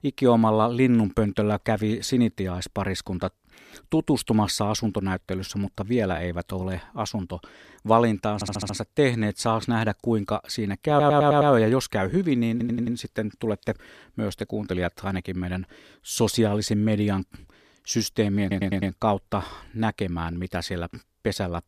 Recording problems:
audio stuttering; 4 times, first at 8.5 s

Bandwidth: 14.5 kHz